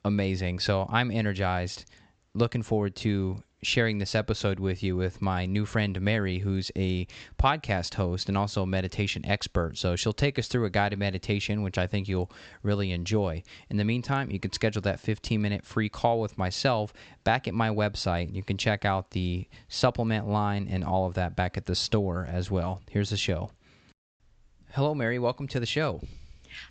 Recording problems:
high frequencies cut off; noticeable; nothing above 8 kHz

